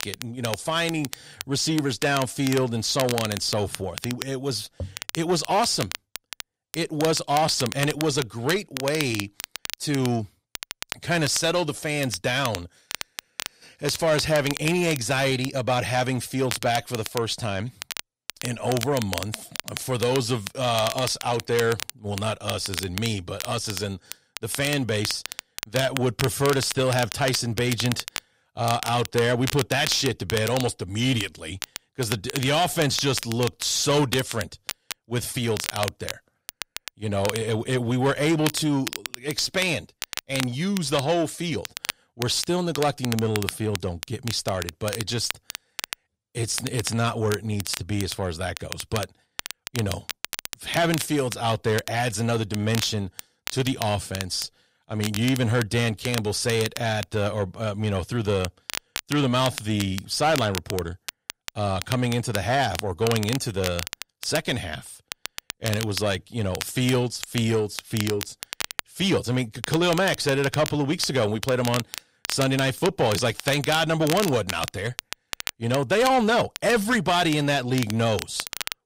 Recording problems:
distortion; slight; 10 dB below the speech
crackle, like an old record; loud; 9 dB below the speech

